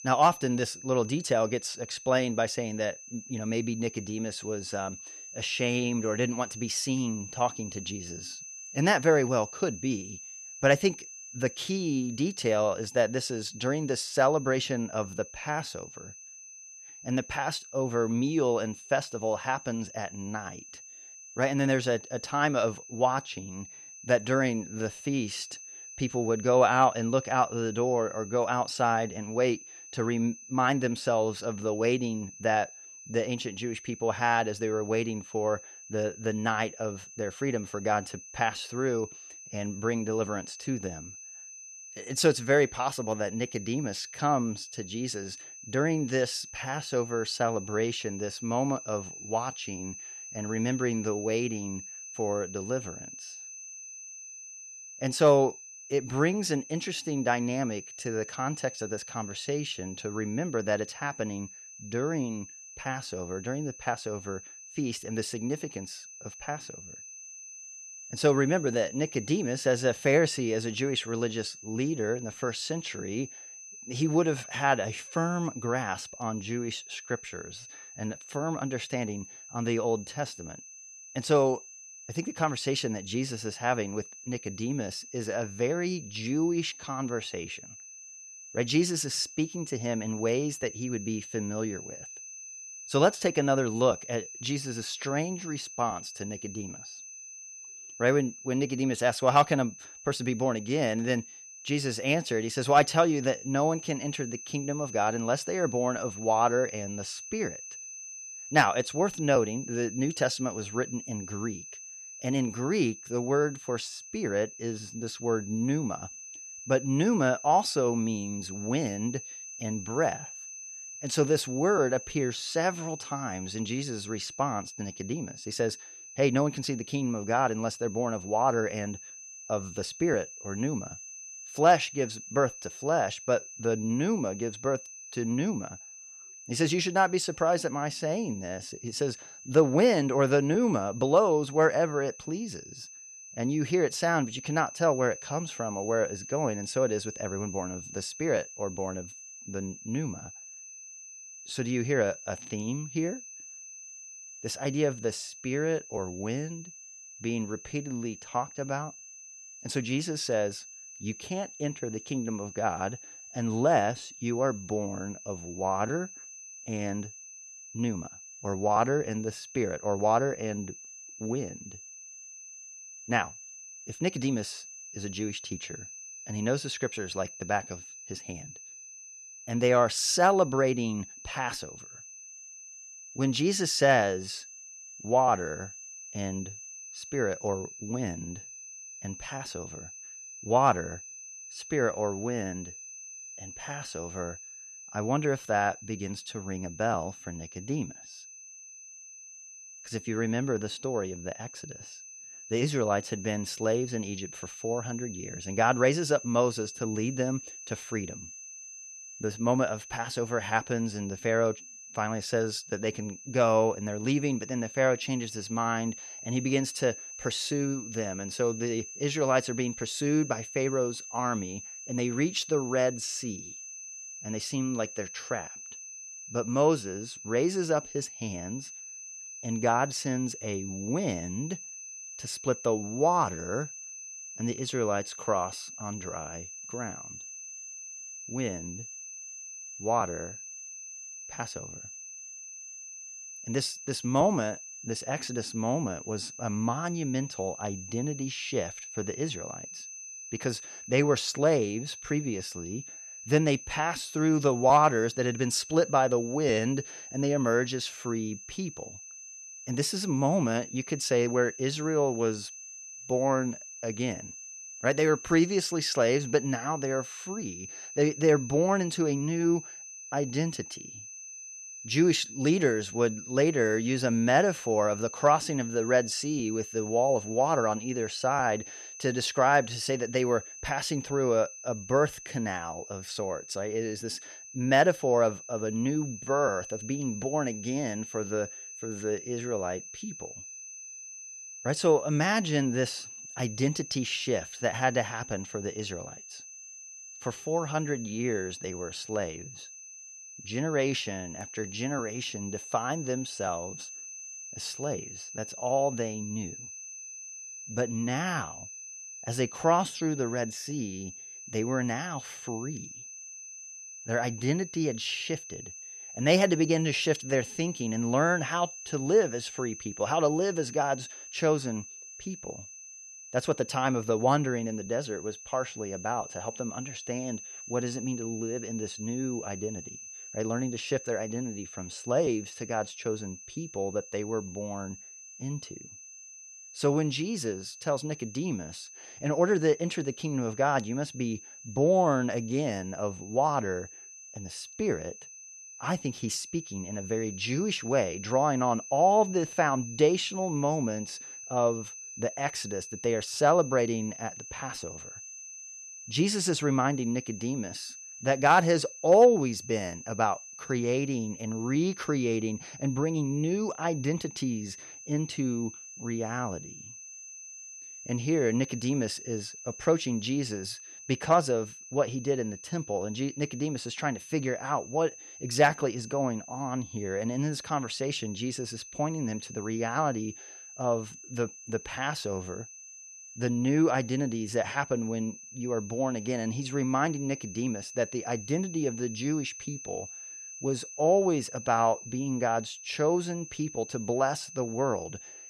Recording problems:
high-pitched whine; noticeable; throughout; 6 kHz, 15 dB below the speech

